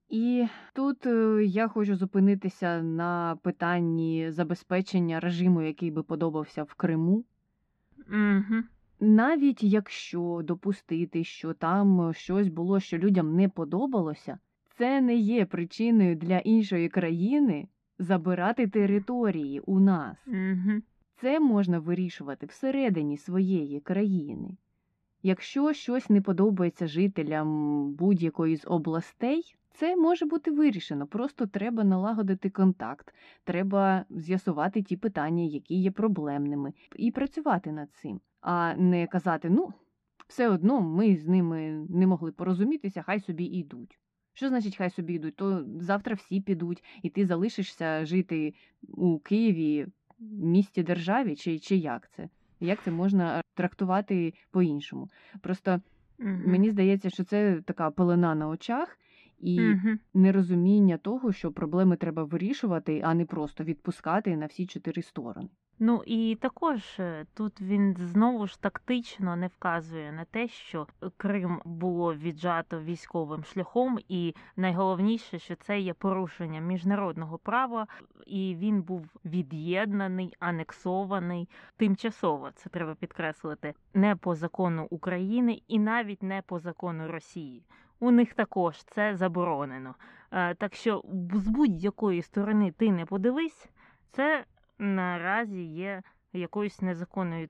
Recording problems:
muffled; very; fading above 2 kHz

